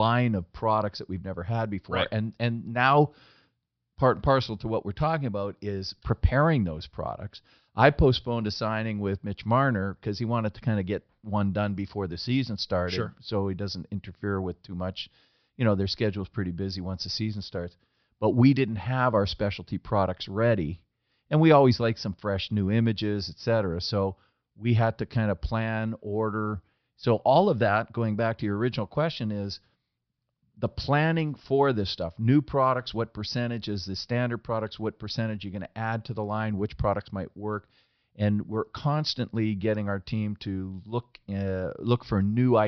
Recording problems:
high frequencies cut off; noticeable; nothing above 5.5 kHz
abrupt cut into speech; at the start and the end

